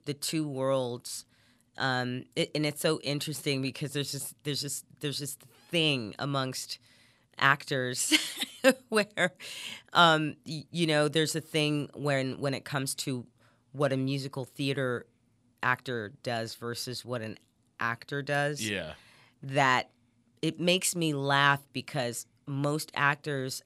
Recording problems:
none

